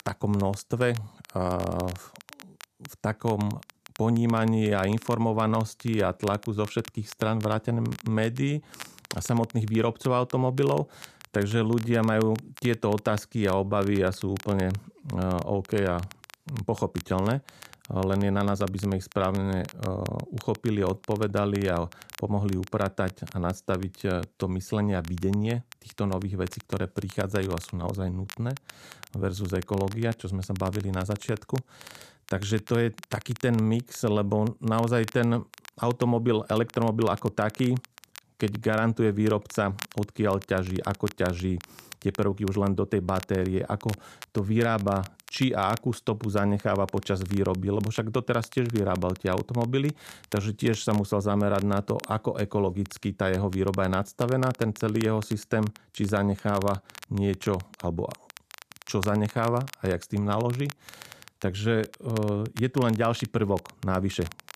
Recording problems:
crackle, like an old record; noticeable; 20 dB below the speech

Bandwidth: 14.5 kHz